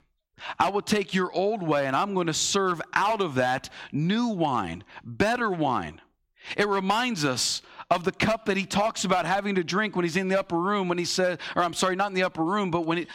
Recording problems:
squashed, flat; somewhat

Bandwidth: 16.5 kHz